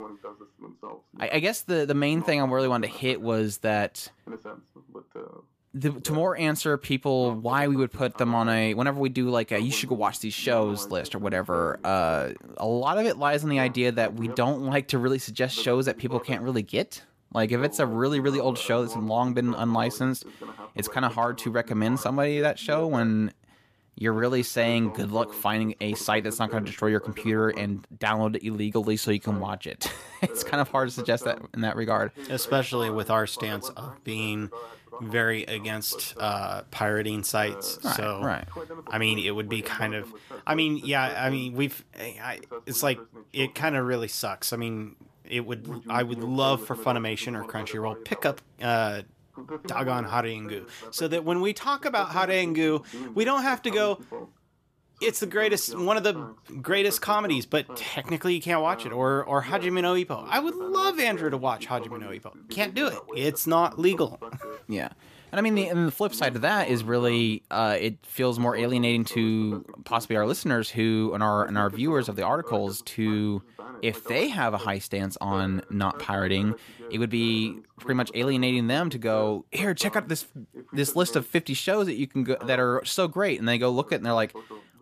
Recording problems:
voice in the background; noticeable; throughout; 15 dB below the speech

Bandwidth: 14.5 kHz